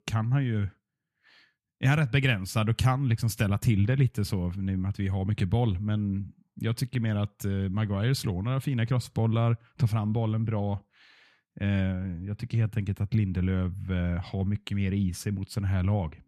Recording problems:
none

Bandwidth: 14 kHz